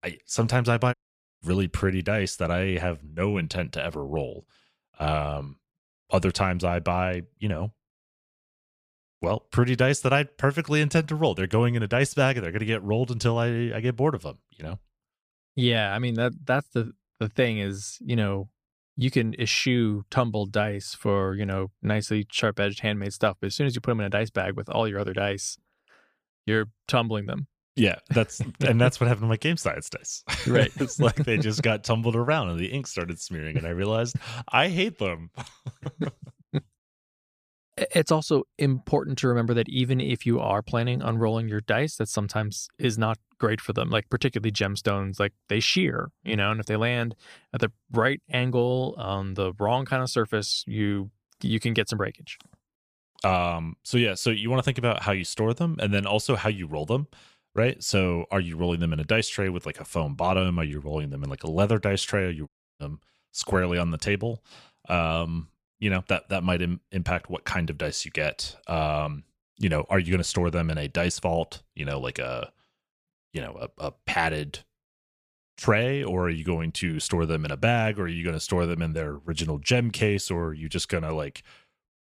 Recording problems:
audio cutting out; at 1 s and at 1:02

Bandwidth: 15 kHz